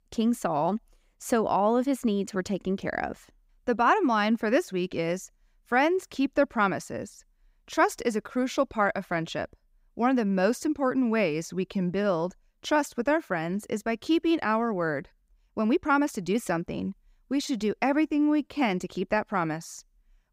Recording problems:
uneven, jittery; slightly; from 12 to 19 s

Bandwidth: 15.5 kHz